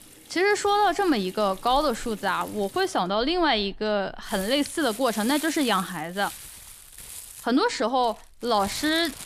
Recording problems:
household noises; noticeable; throughout; 15 dB below the speech

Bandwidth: 14.5 kHz